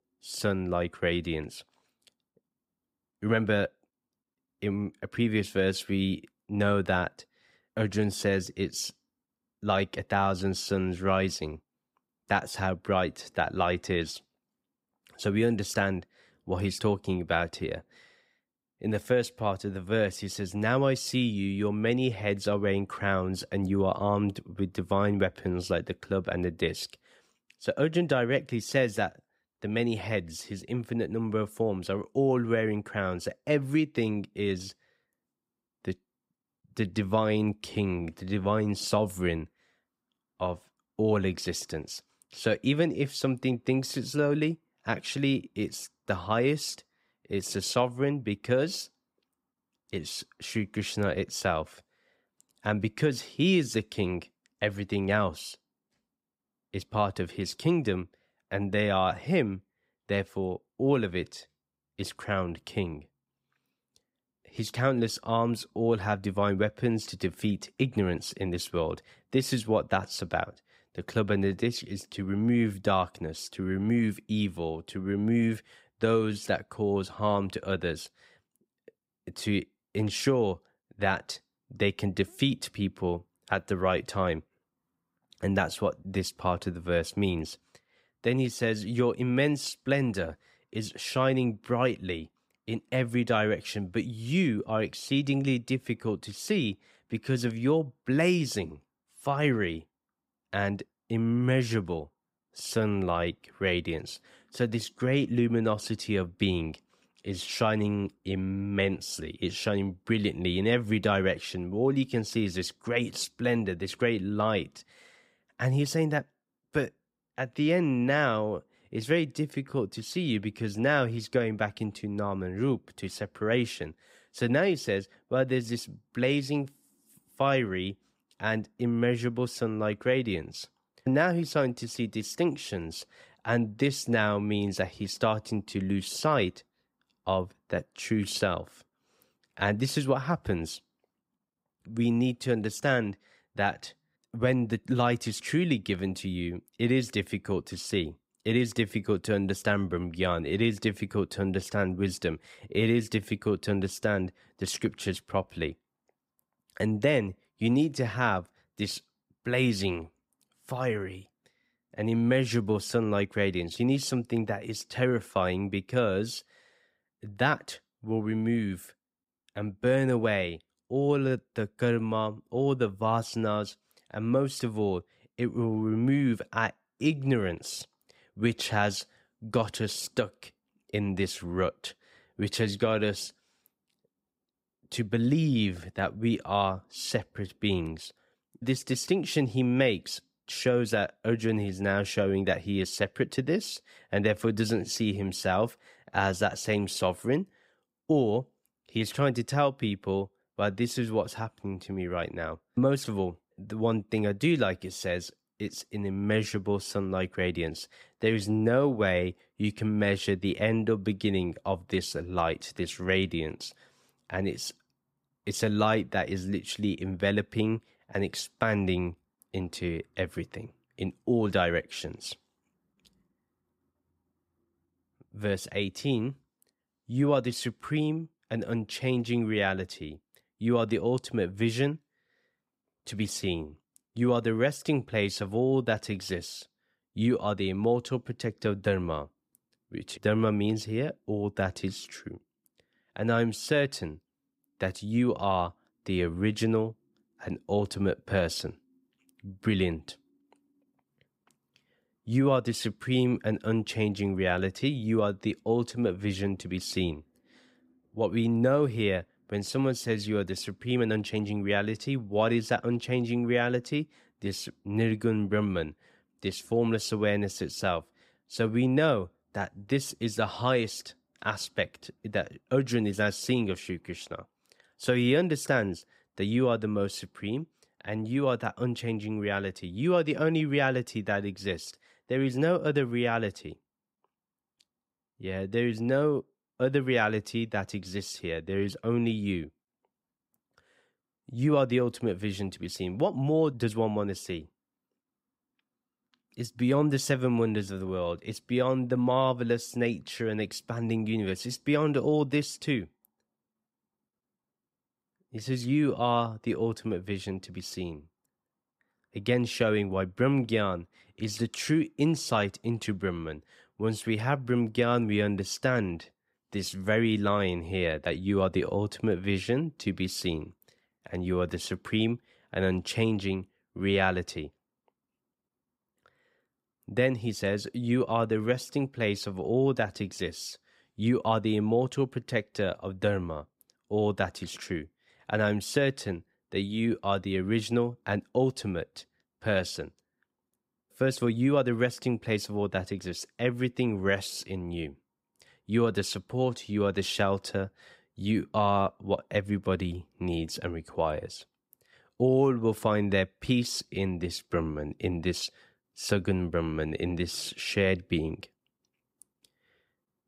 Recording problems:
uneven, jittery; strongly; from 1:53 to 5:28

